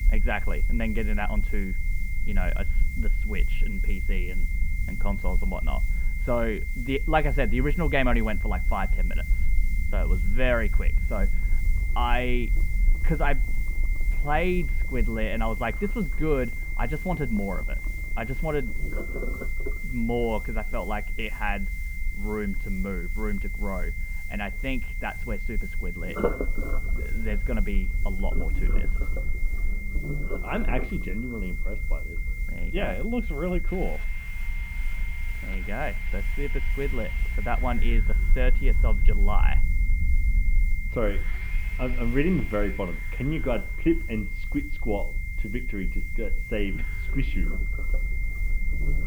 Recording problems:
muffled; very; fading above 2 kHz
high-pitched whine; loud; throughout; 2 kHz, 7 dB below the speech
household noises; noticeable; from 11 s on; 10 dB below the speech
hiss; faint; throughout; 20 dB below the speech
low rumble; faint; throughout; 20 dB below the speech

